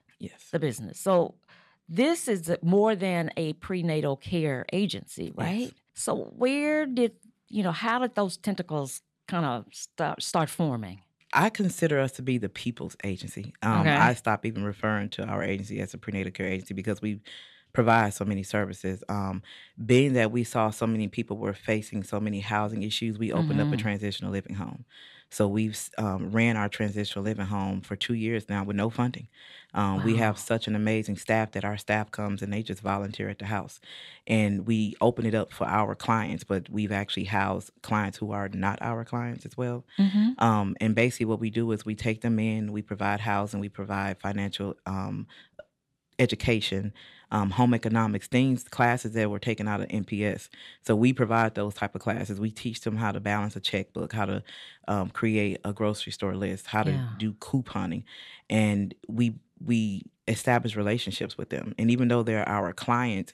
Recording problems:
none

